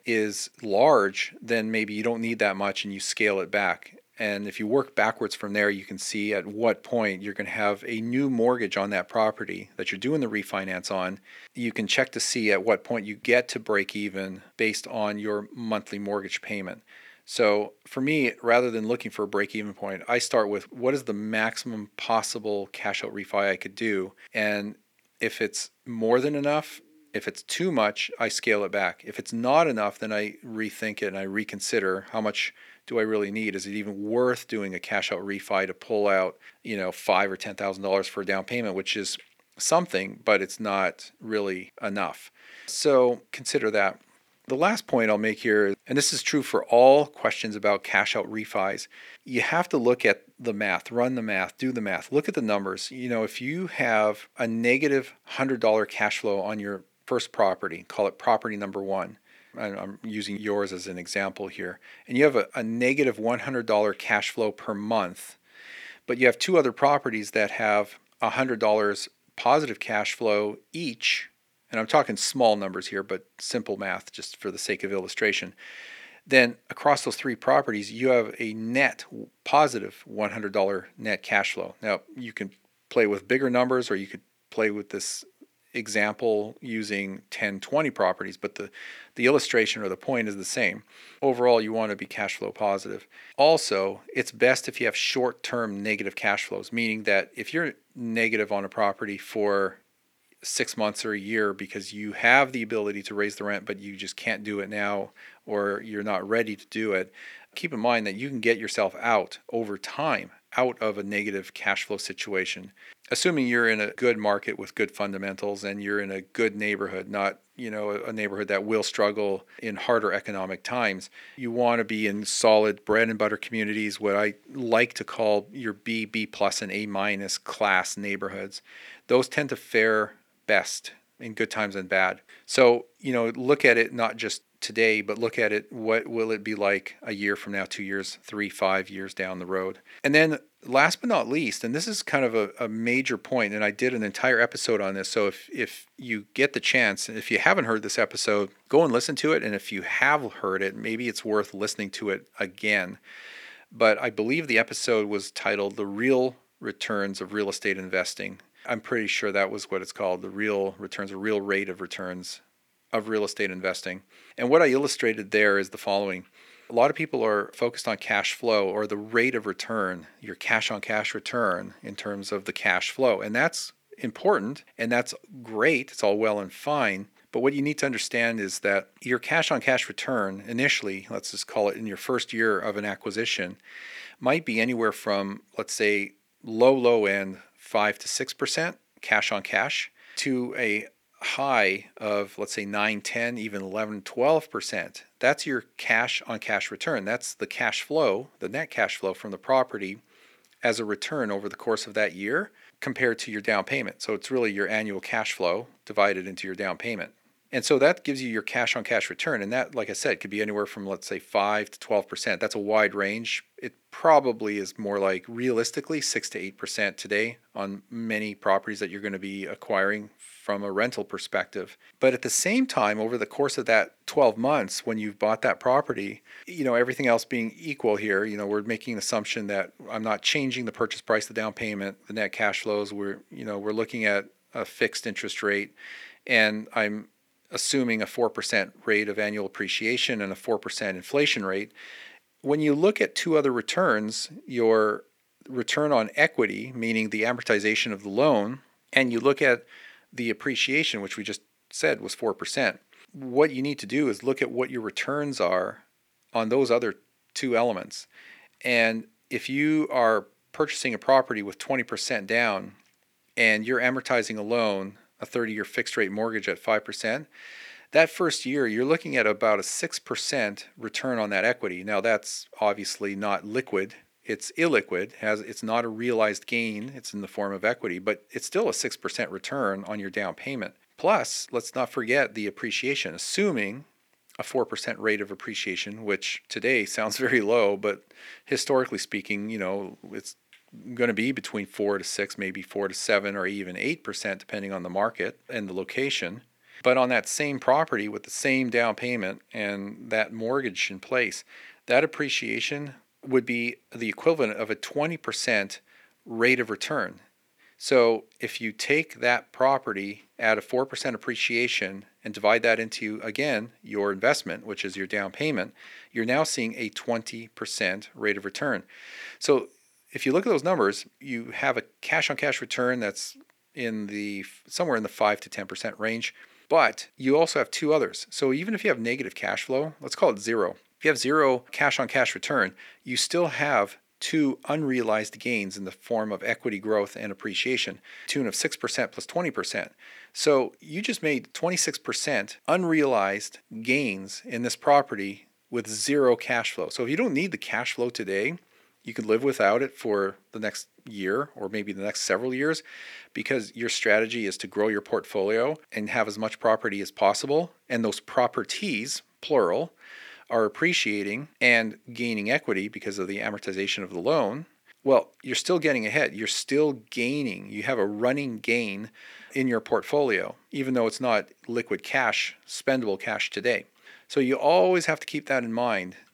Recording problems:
thin; very slightly; fading below 250 Hz

